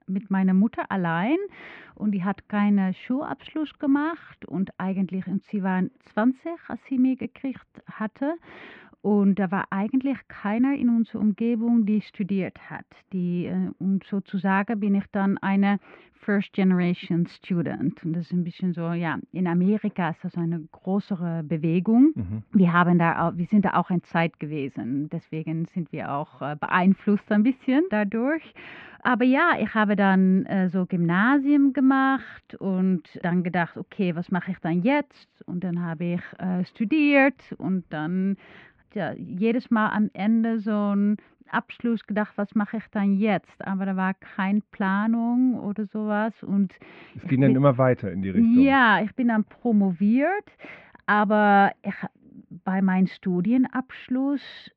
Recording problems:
muffled; very; fading above 2.5 kHz

